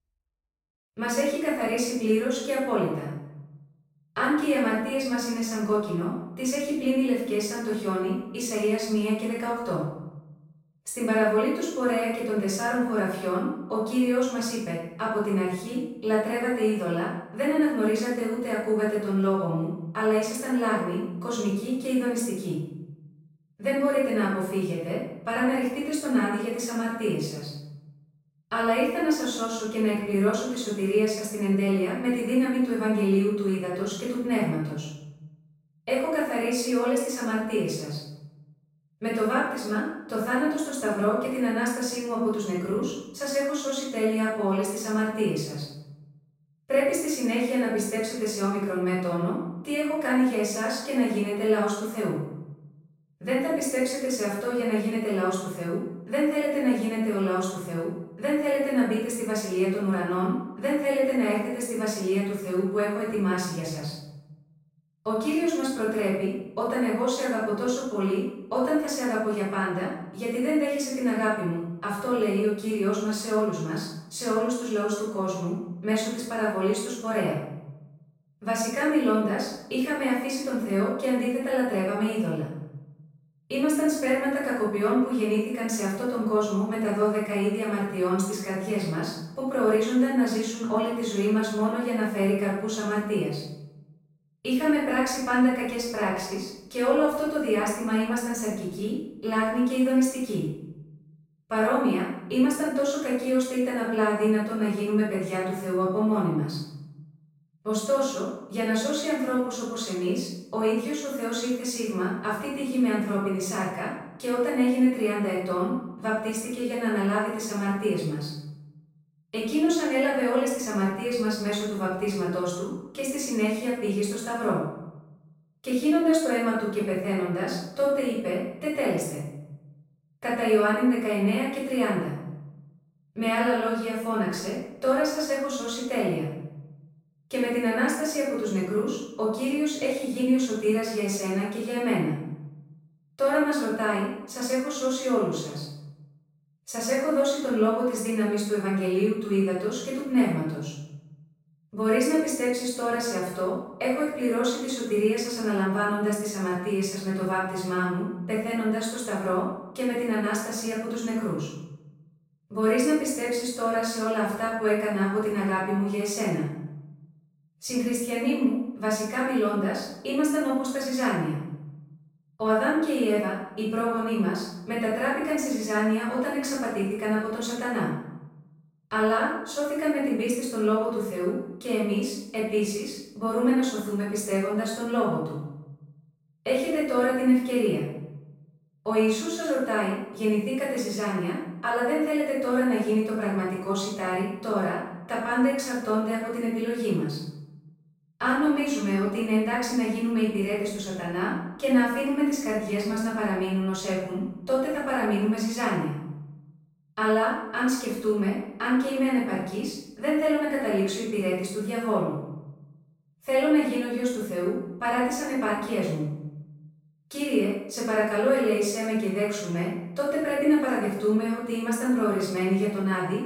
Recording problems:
off-mic speech; far
room echo; noticeable; dies away in 0.8 s

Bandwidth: 16 kHz